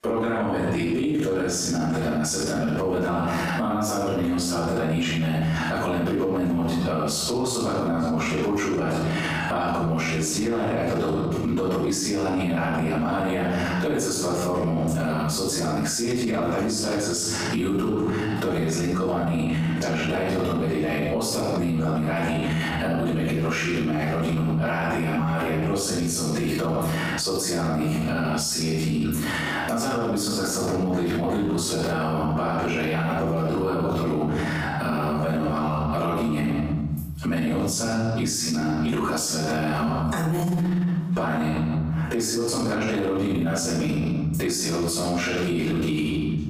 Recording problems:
room echo; strong; dies away in 0.9 s
off-mic speech; far
squashed, flat; heavily

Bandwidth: 15 kHz